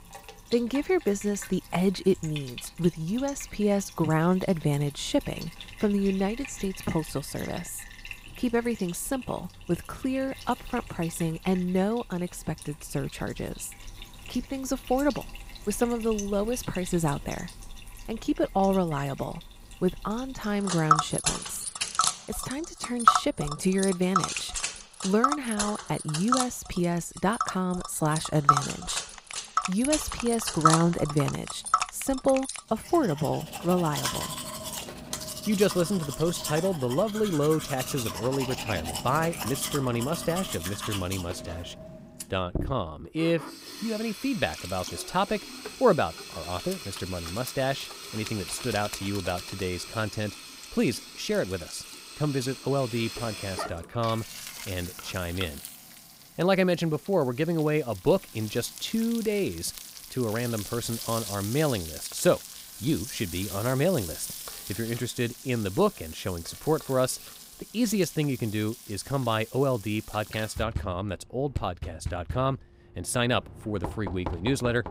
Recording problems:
household noises; loud; throughout; 5 dB below the speech

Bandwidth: 15.5 kHz